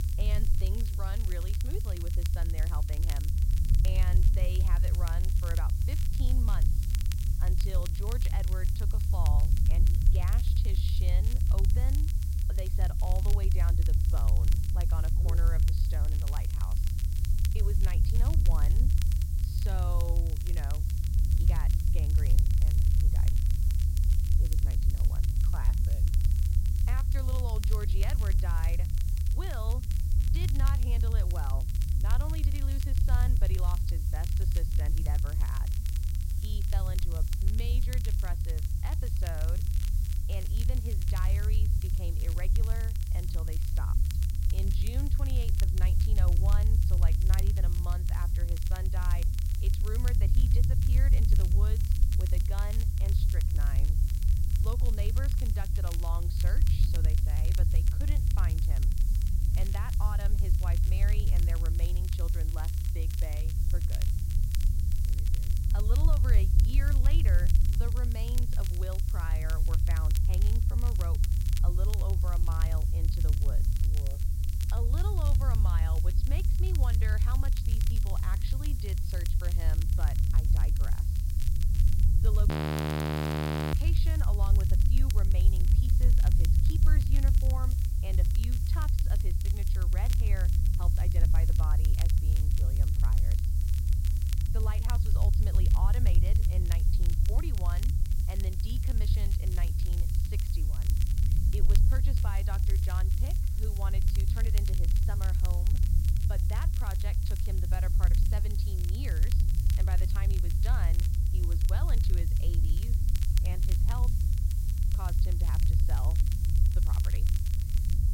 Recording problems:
high frequencies cut off; noticeable; nothing above 5.5 kHz
hiss; loud; throughout; 5 dB below the speech
low rumble; loud; throughout; 1 dB below the speech
crackle, like an old record; loud; 5 dB below the speech
audio freezing; at 1:22 for 1 s

